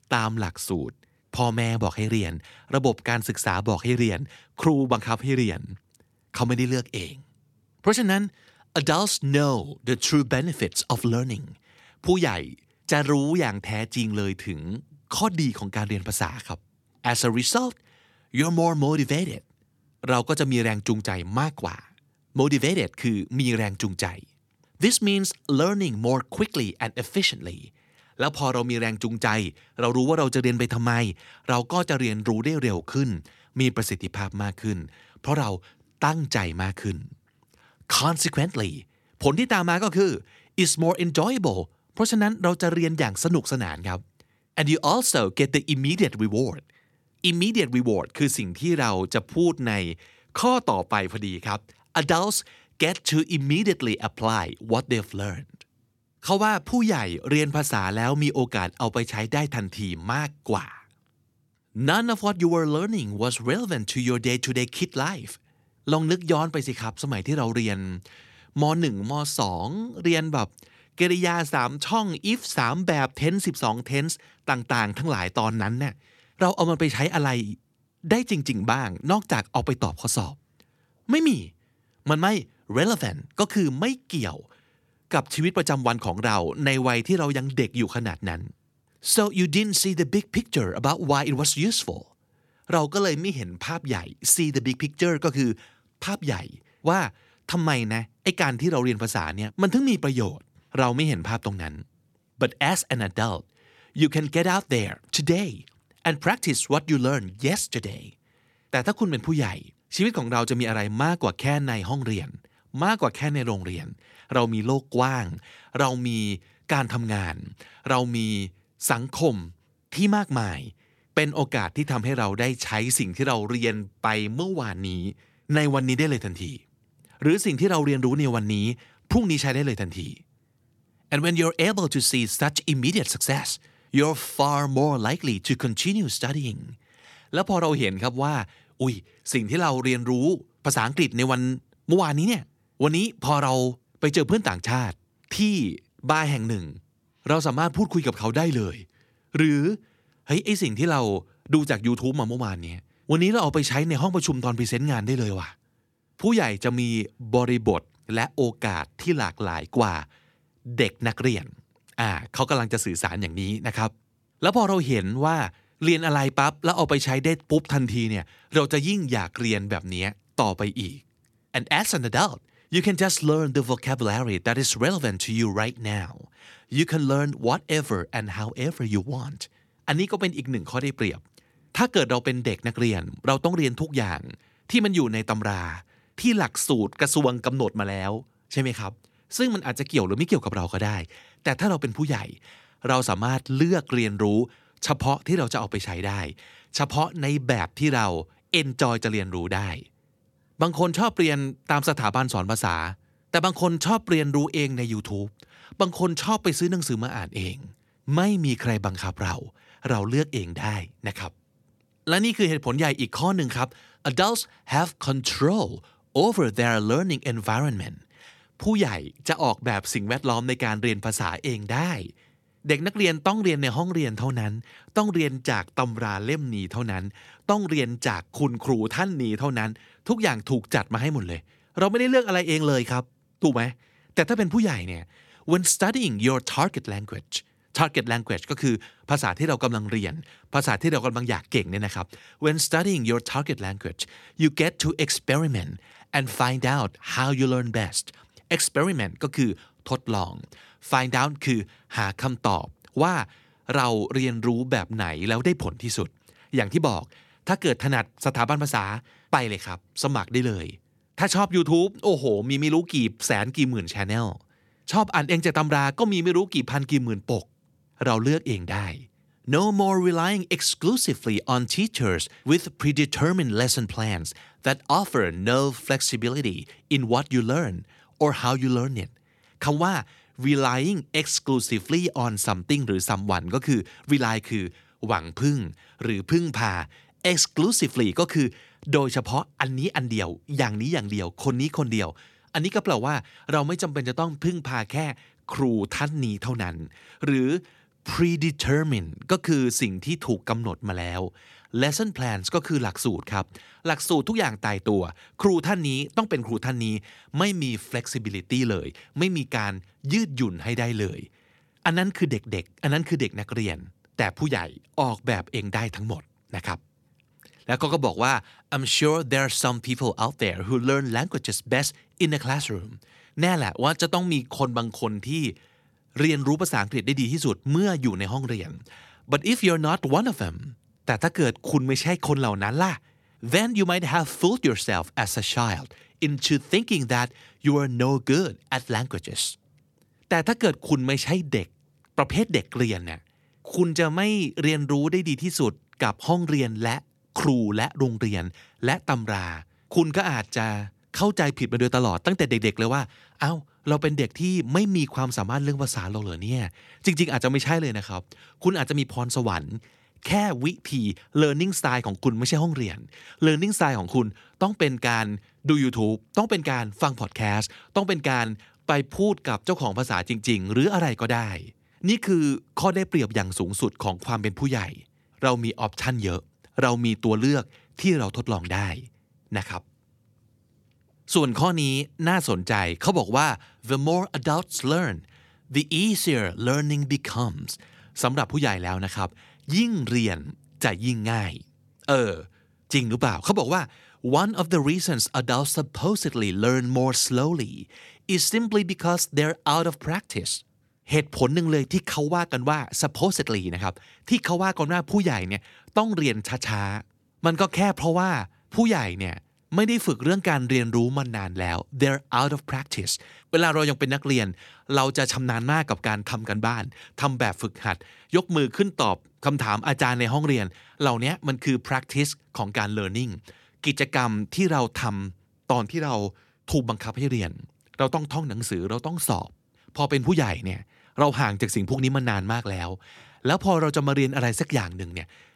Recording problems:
none

